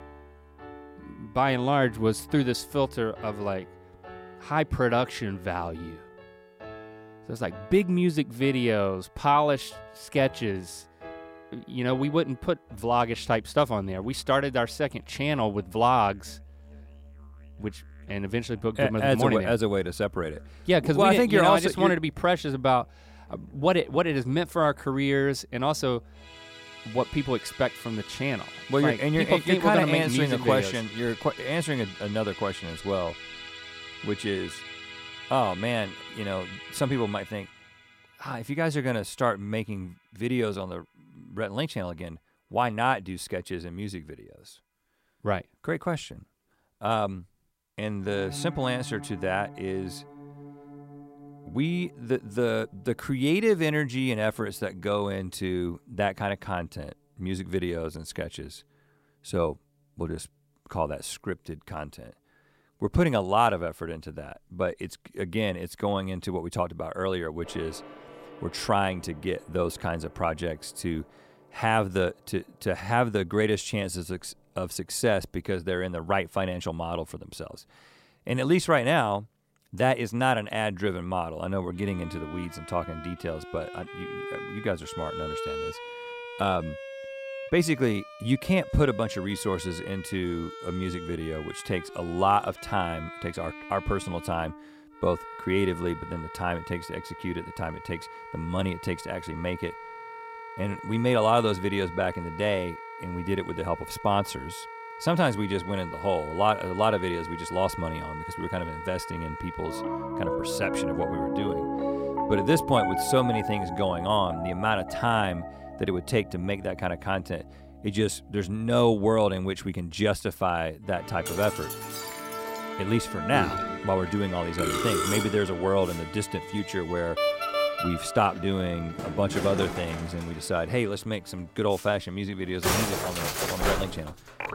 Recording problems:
background music; loud; throughout; 9 dB below the speech

